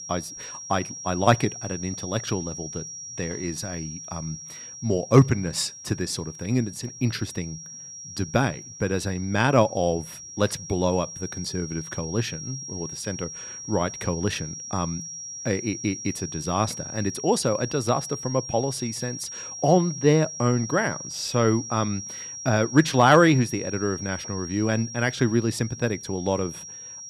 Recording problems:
high-pitched whine; loud; throughout; 5.5 kHz, 10 dB below the speech

